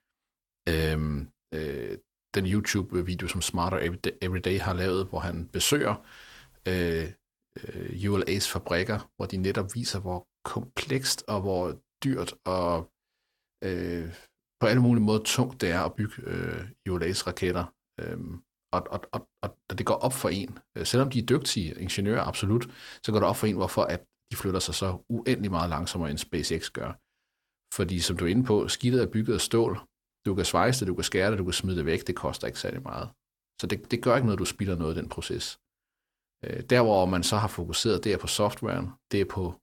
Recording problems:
none

